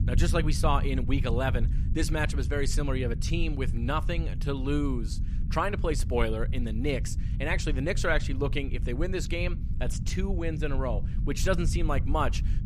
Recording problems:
low rumble; noticeable; throughout; 15 dB below the speech

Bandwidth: 14.5 kHz